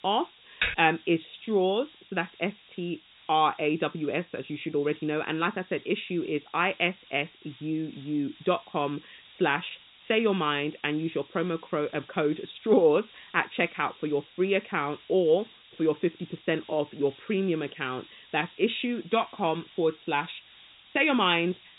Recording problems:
high frequencies cut off; severe; nothing above 4 kHz
hiss; faint; throughout; 25 dB below the speech
keyboard typing; noticeable; at 0.5 s; peak 1 dB below the speech

